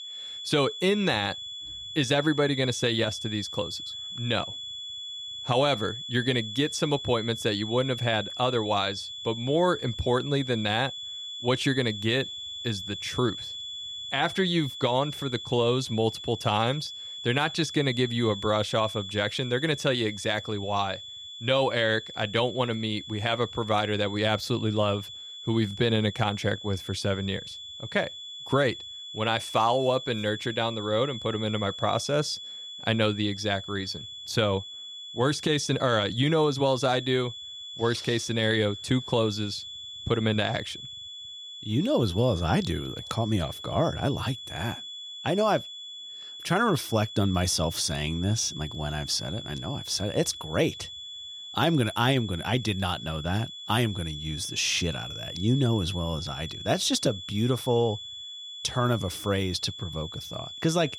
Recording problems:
high-pitched whine; loud; throughout; 3.5 kHz, 9 dB below the speech

